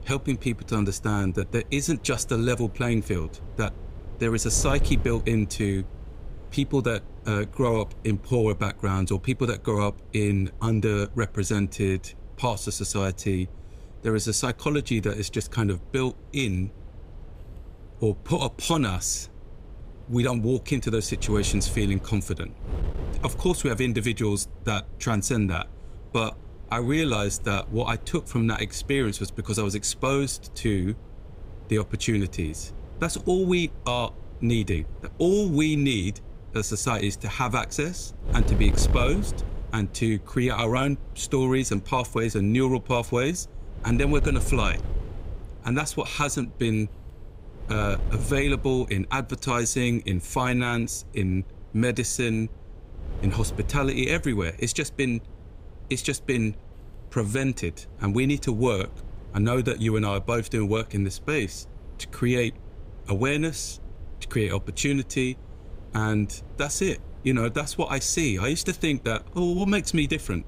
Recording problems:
wind noise on the microphone; occasional gusts; 20 dB below the speech

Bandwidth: 15.5 kHz